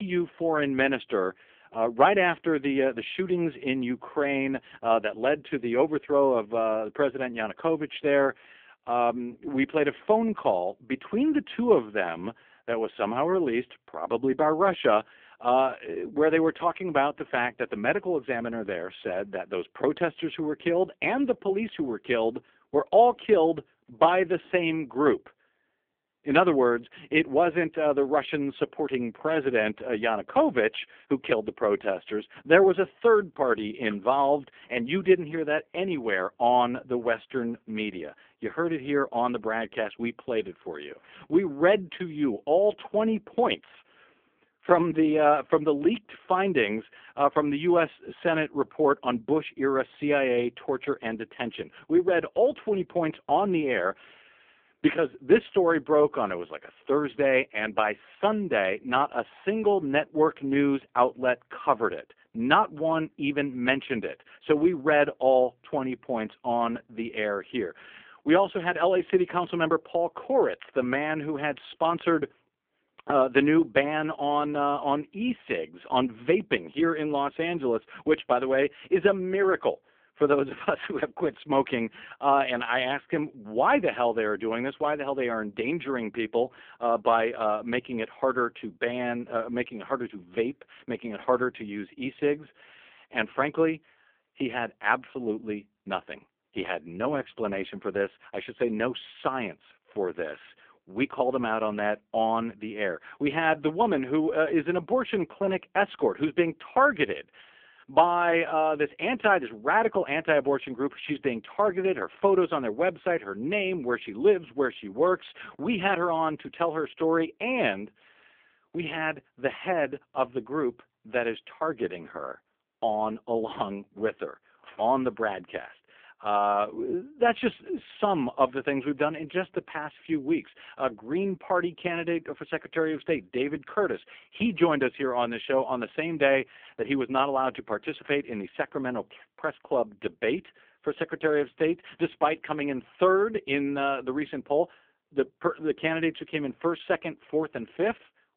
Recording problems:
phone-call audio; poor line; nothing above 3.5 kHz
abrupt cut into speech; at the start

